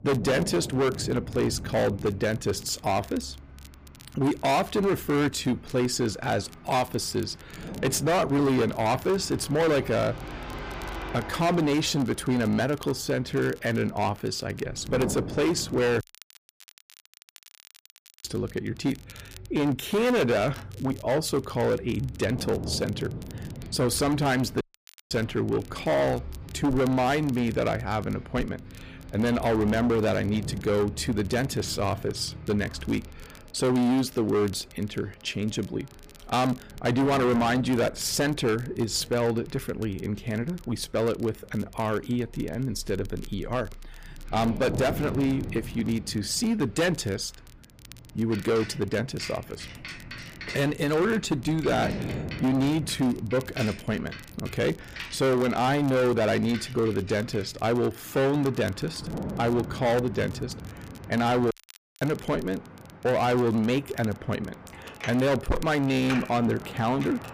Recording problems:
distortion; heavy; 13% of the sound clipped
traffic noise; noticeable; throughout; 15 dB below the speech
wind noise on the microphone; occasional gusts; 15 dB below the speech
crackle, like an old record; faint; 25 dB below the speech
audio cutting out; at 16 s for 2 s, at 25 s for 0.5 s and at 1:02 for 0.5 s

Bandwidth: 15 kHz